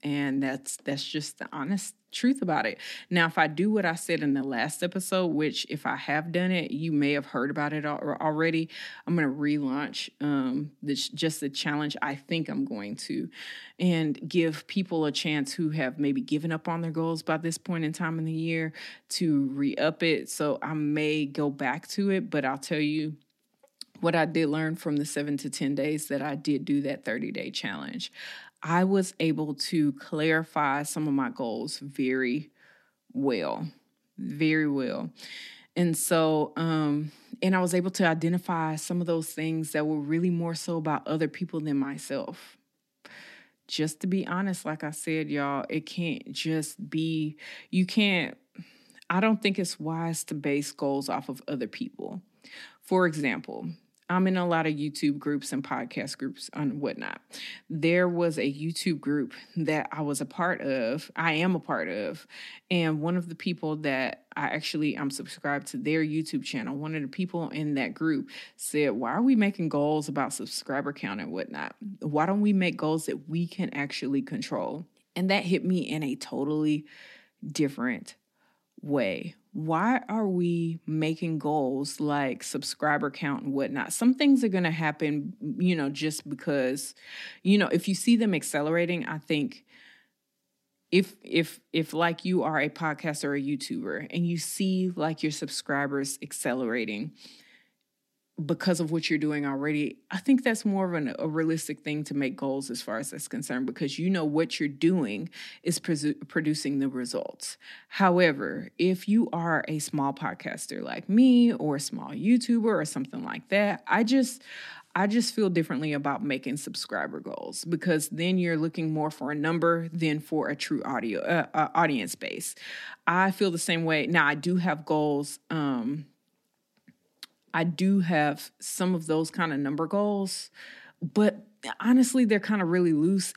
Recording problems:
none

